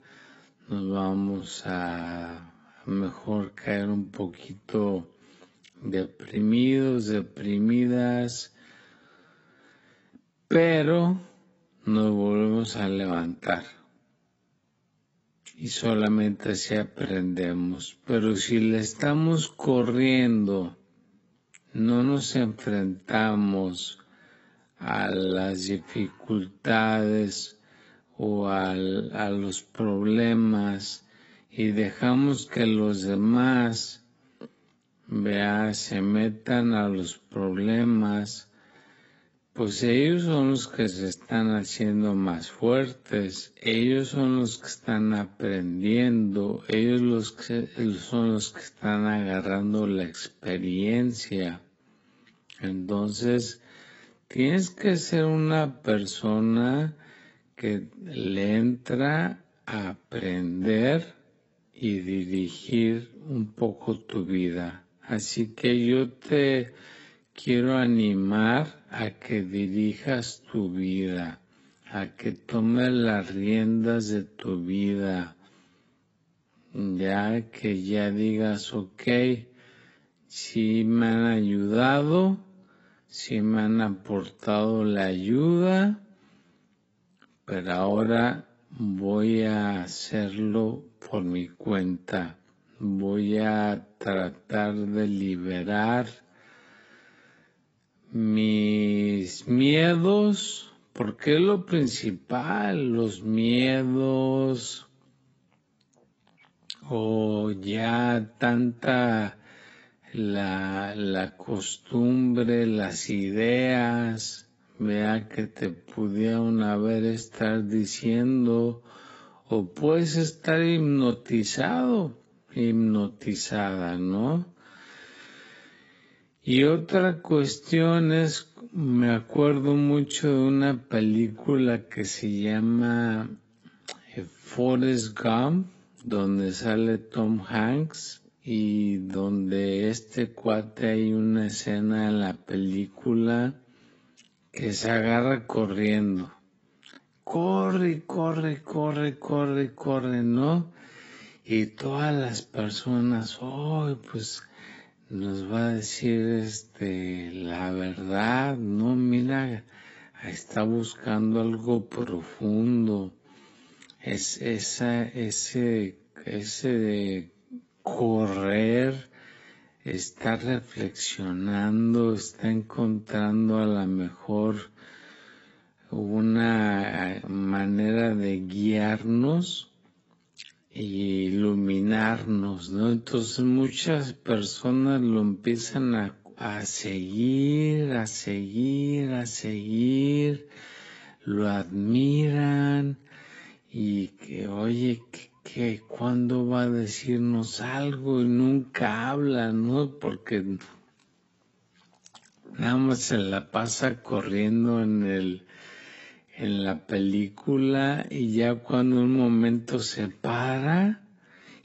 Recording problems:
garbled, watery; badly; nothing above 7.5 kHz
wrong speed, natural pitch; too slow; 0.5 times normal speed

